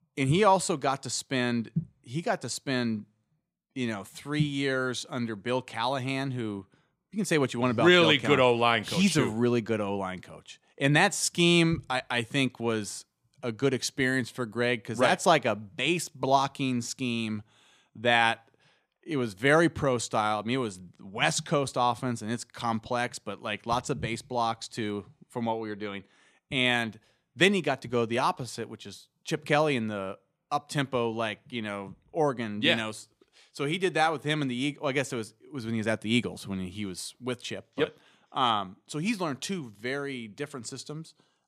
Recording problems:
none

